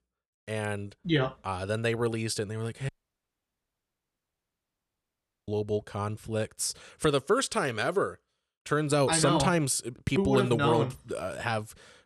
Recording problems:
audio cutting out; at 3 s for 2.5 s

